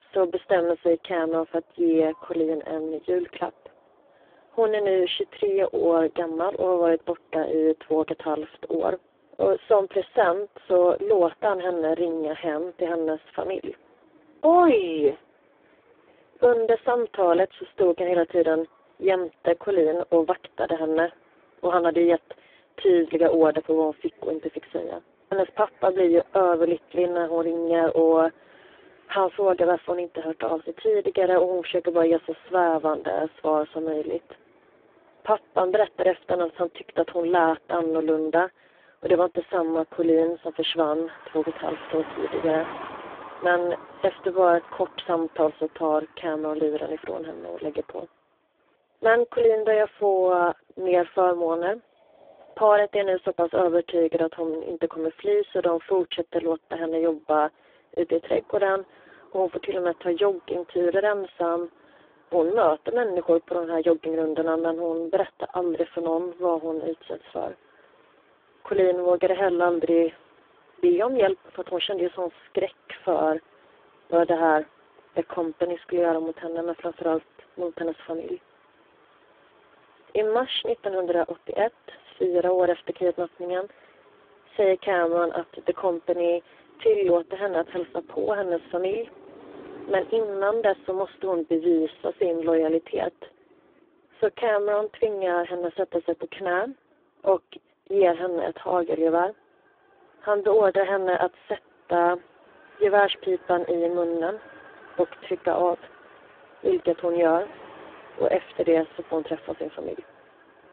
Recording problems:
phone-call audio; poor line
traffic noise; faint; throughout; 25 dB below the speech

